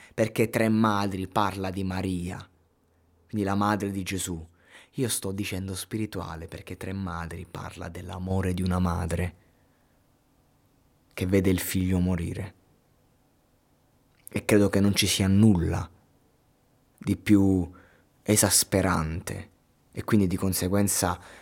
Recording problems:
none

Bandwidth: 16.5 kHz